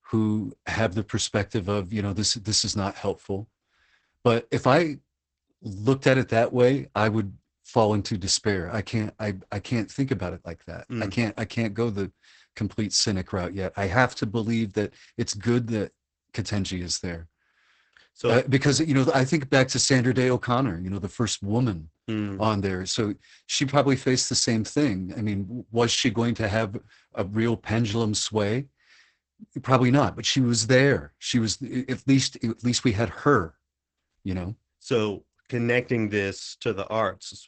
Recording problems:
garbled, watery; badly; nothing above 8 kHz

